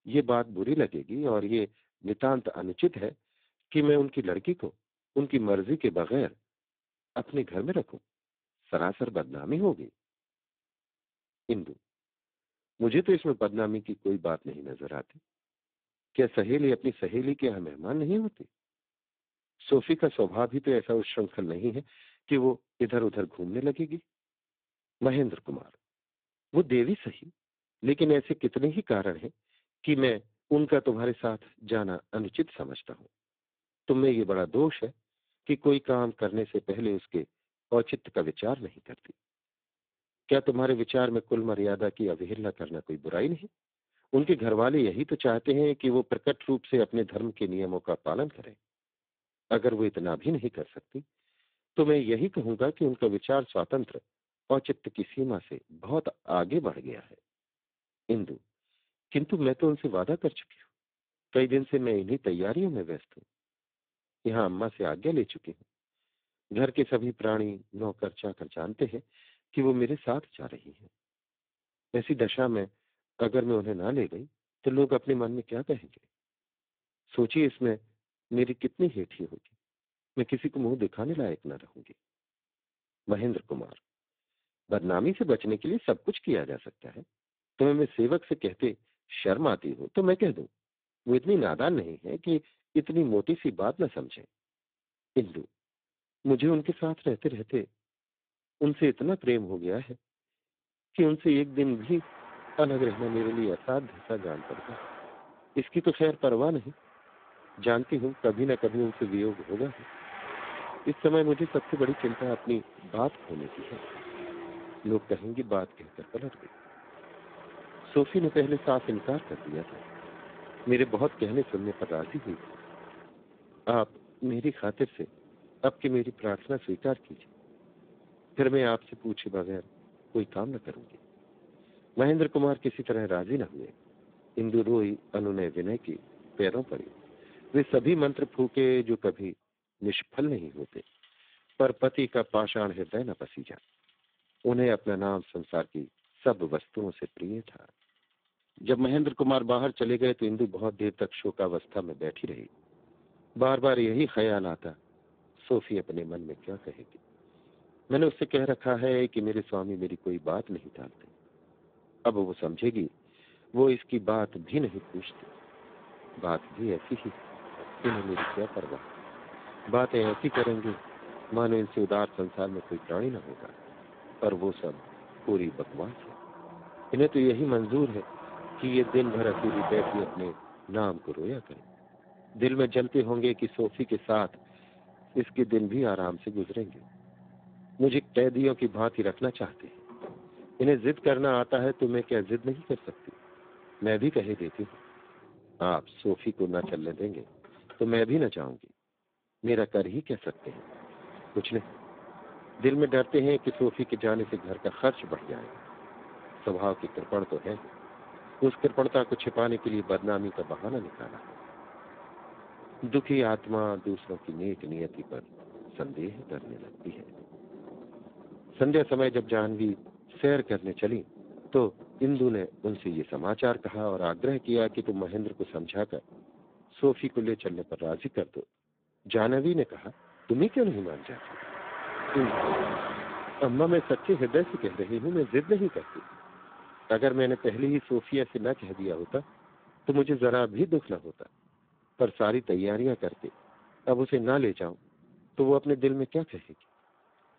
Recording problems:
phone-call audio; poor line; nothing above 3.5 kHz
traffic noise; noticeable; from 1:42 on; 15 dB below the speech

